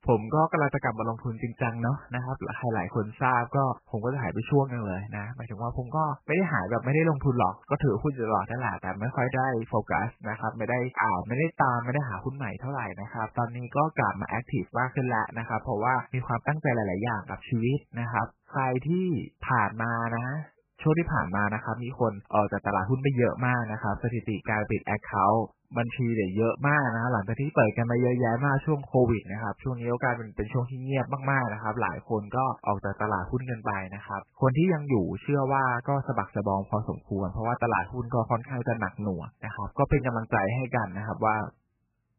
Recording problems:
garbled, watery; badly; nothing above 2.5 kHz

